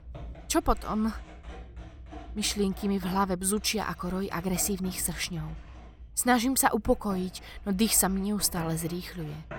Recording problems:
household noises; noticeable; throughout; 20 dB below the speech

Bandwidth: 17 kHz